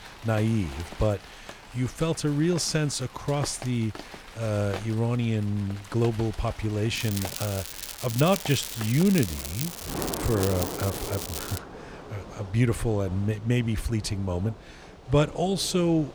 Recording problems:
crackling; loud; from 7 to 12 s; 7 dB below the speech
rain or running water; noticeable; throughout; 15 dB below the speech

